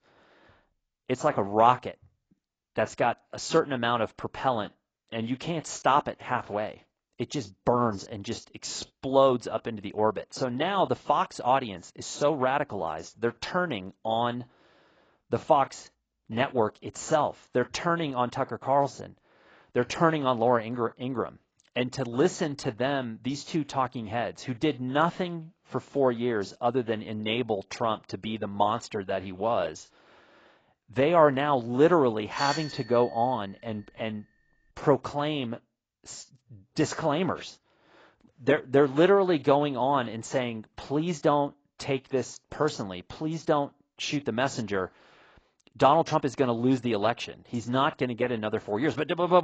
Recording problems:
garbled, watery; badly; nothing above 7.5 kHz
doorbell; noticeable; at 32 s; peak 6 dB below the speech
abrupt cut into speech; at the end

